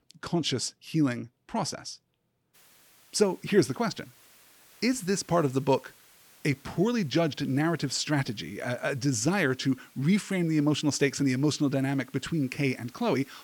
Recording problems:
hiss; faint; from 2.5 s on; 25 dB below the speech

